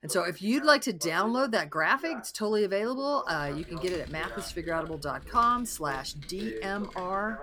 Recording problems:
voice in the background; noticeable; throughout; 15 dB below the speech
keyboard typing; faint; from 3.5 s on; peak 15 dB below the speech

